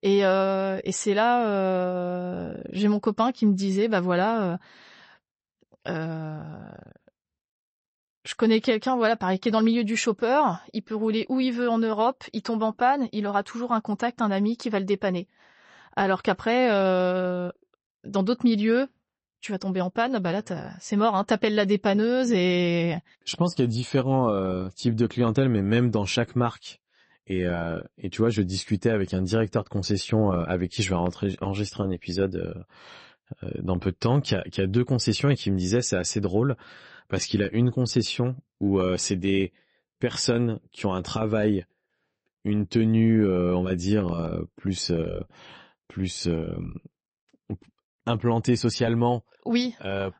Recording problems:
garbled, watery; slightly; nothing above 8 kHz

